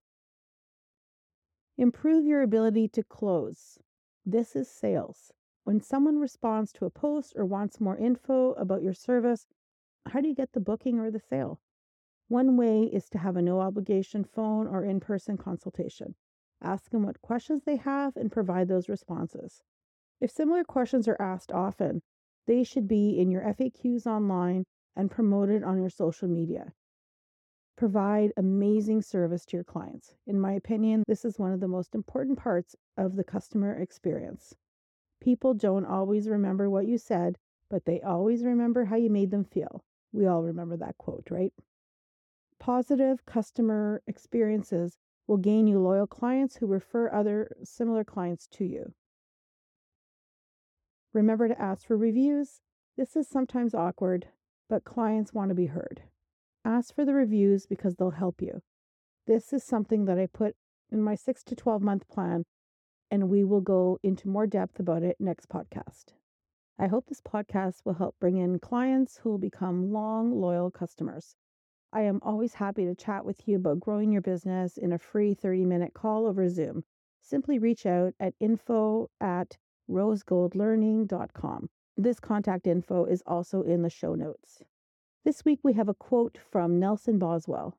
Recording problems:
muffled; slightly; fading above 1 kHz

